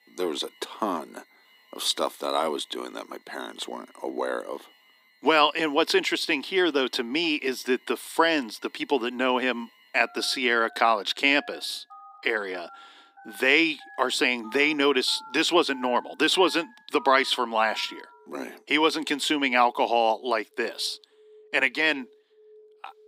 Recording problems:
thin; somewhat; fading below 250 Hz
alarms or sirens; faint; throughout; 25 dB below the speech

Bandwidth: 15.5 kHz